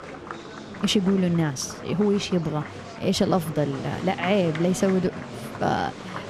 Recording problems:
murmuring crowd; noticeable; throughout; 10 dB below the speech

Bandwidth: 14.5 kHz